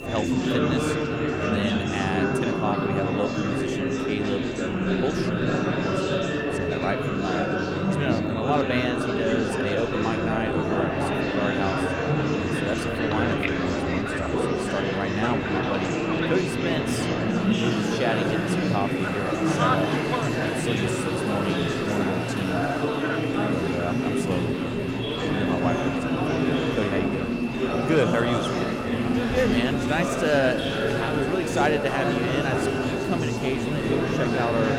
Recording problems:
murmuring crowd; very loud; throughout; 4 dB above the speech
high-pitched whine; noticeable; throughout; 2.5 kHz, 10 dB below the speech
rain or running water; noticeable; throughout; 15 dB below the speech
electrical hum; faint; throughout; 60 Hz, 20 dB below the speech

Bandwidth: 18 kHz